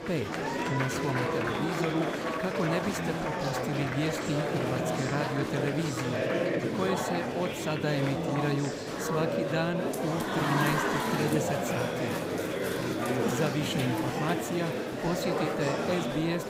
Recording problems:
murmuring crowd; very loud; throughout; 2 dB above the speech

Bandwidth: 15.5 kHz